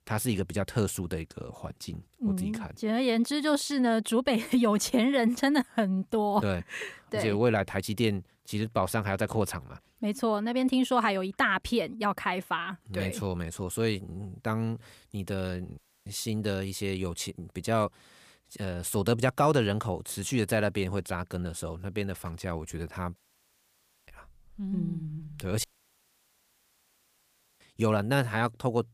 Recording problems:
audio cutting out; at 16 s, at 23 s for 1 s and at 26 s for 2 s

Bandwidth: 15 kHz